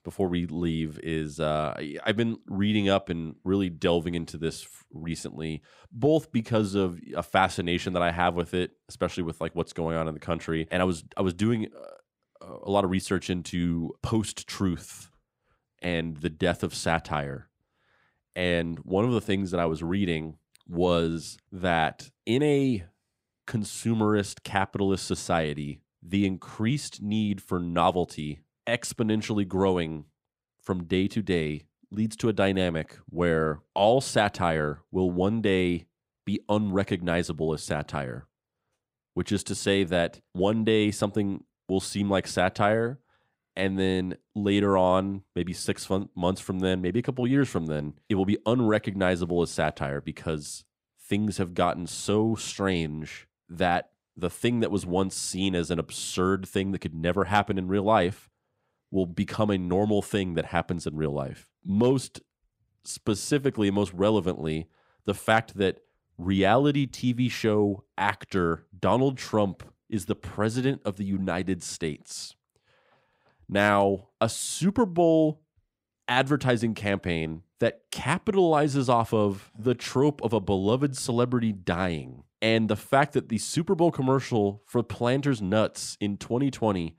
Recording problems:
none

